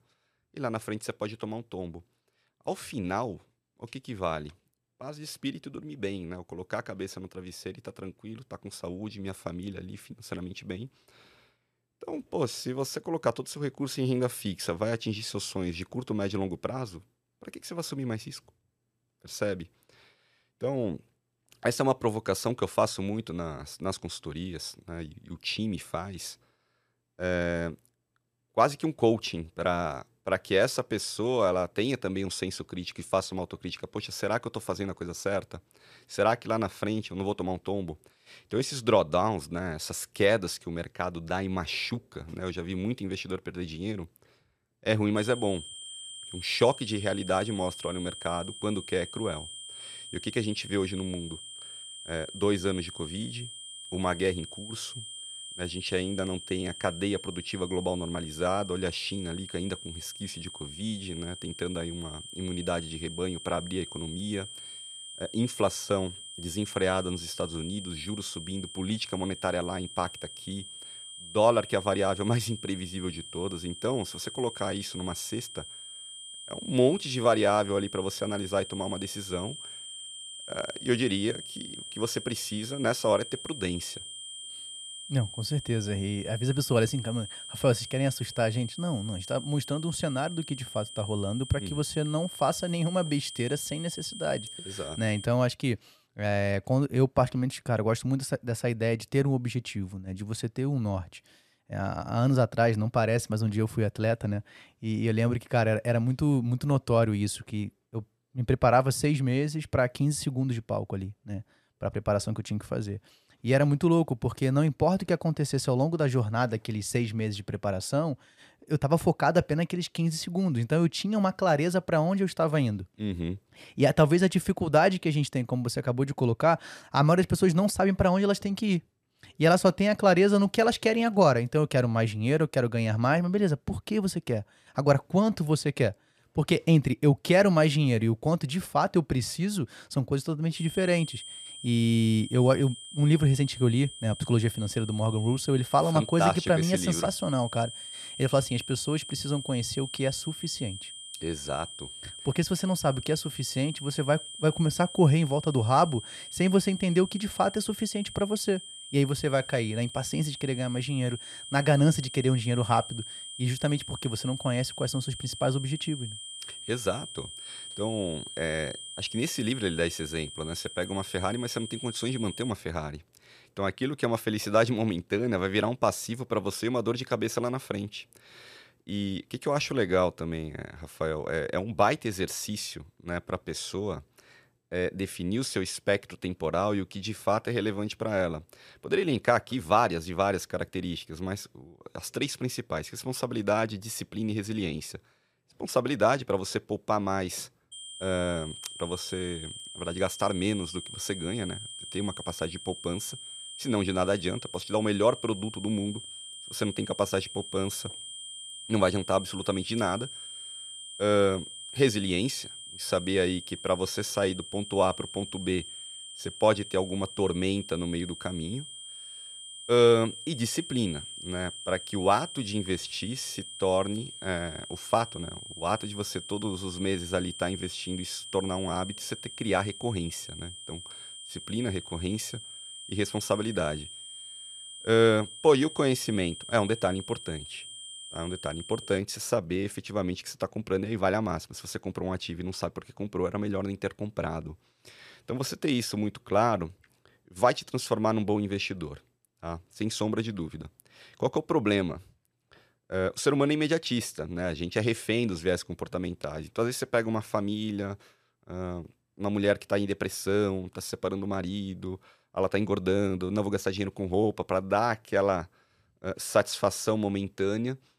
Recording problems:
high-pitched whine; noticeable; from 45 s to 1:35, from 2:21 to 2:53 and from 3:18 to 3:59; 3 kHz, 10 dB below the speech

